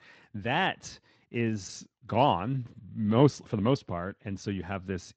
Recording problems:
garbled, watery; slightly

